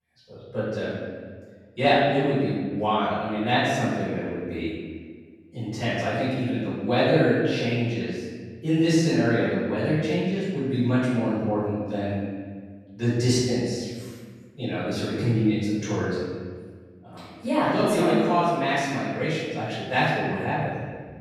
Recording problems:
room echo; strong; dies away in 1.4 s
off-mic speech; far

